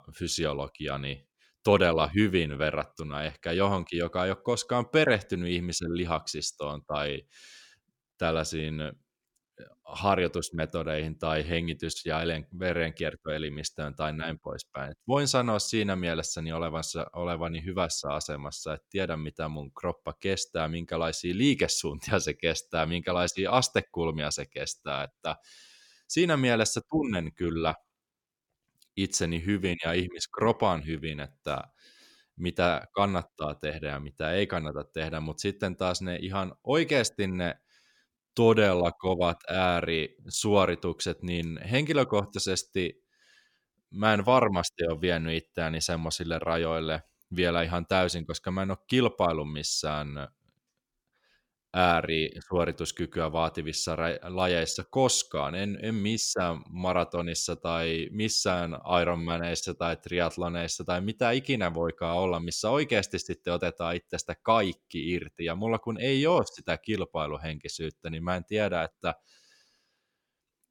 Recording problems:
none

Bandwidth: 17 kHz